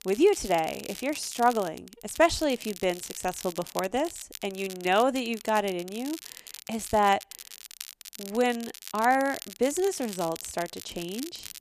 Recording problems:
crackle, like an old record; noticeable; 15 dB below the speech

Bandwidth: 14.5 kHz